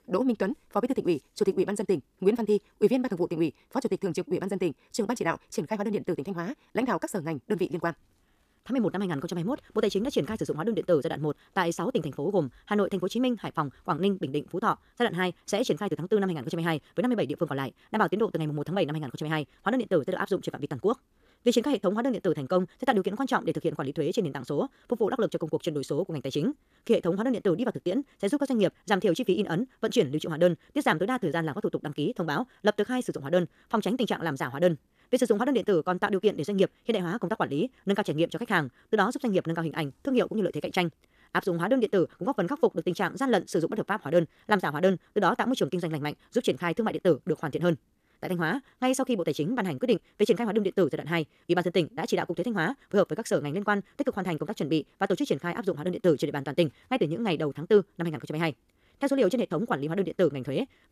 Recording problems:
wrong speed, natural pitch; too fast; 1.6 times normal speed

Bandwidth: 14.5 kHz